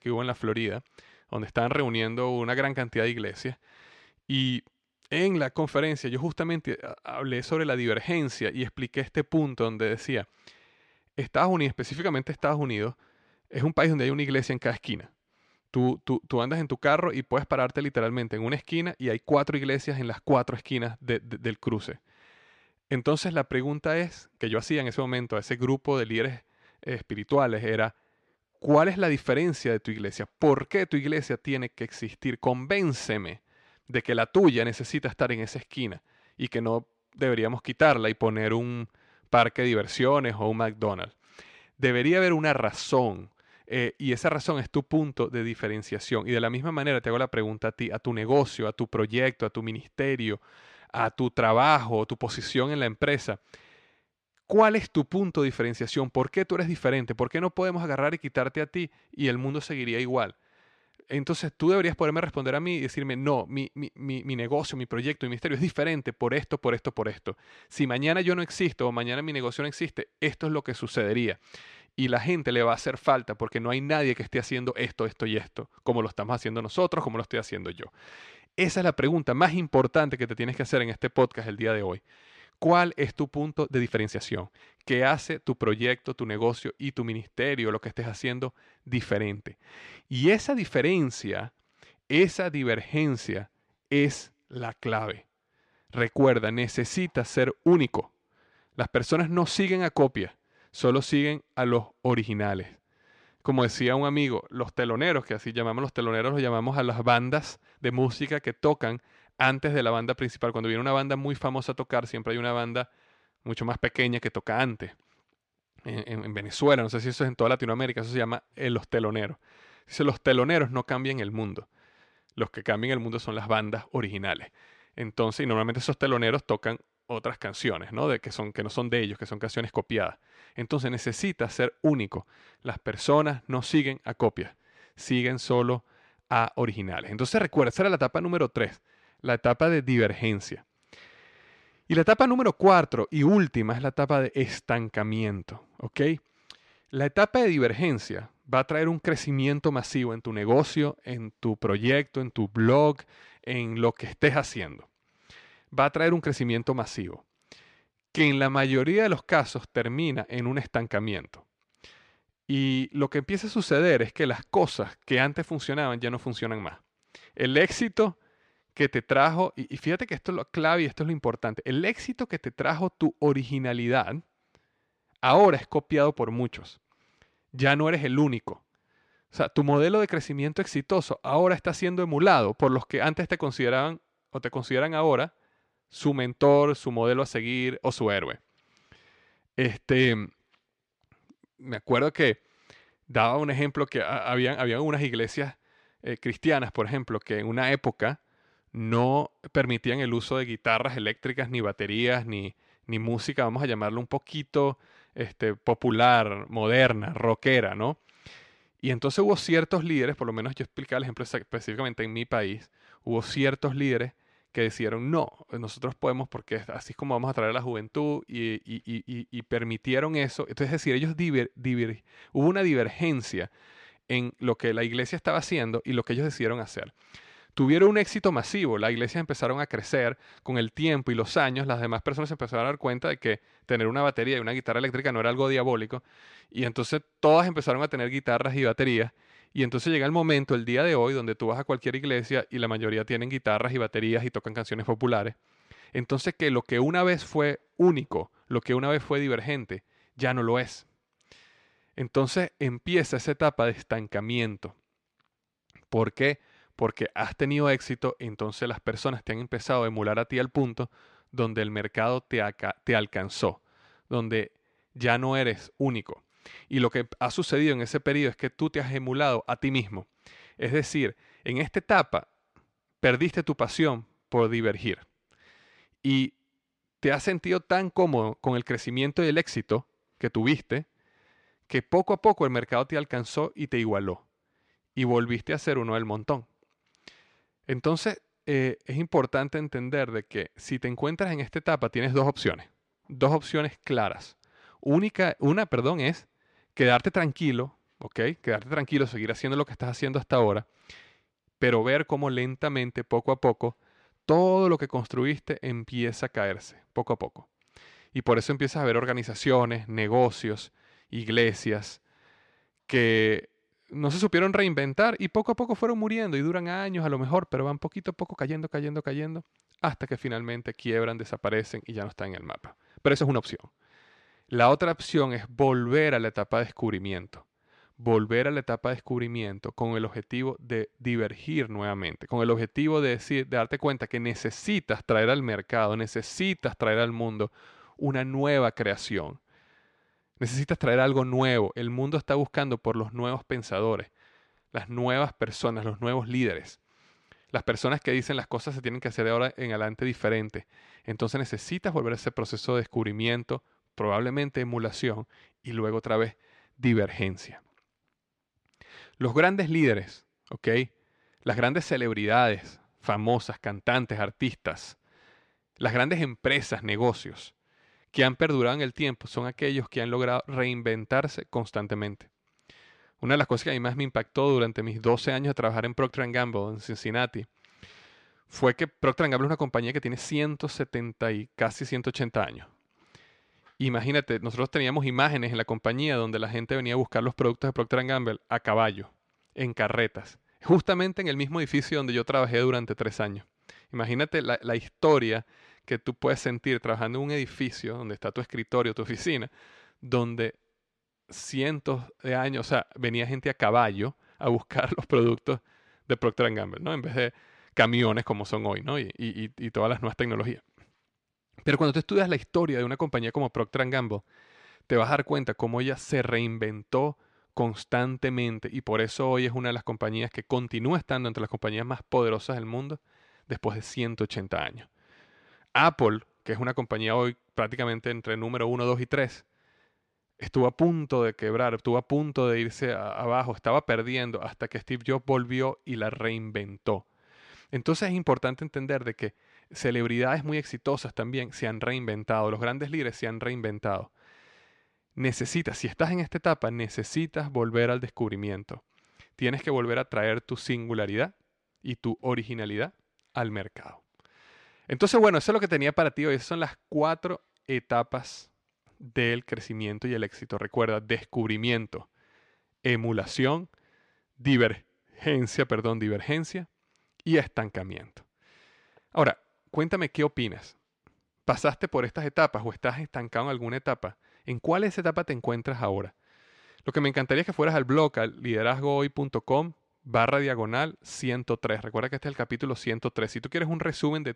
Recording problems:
uneven, jittery; strongly; from 24 s to 5:46

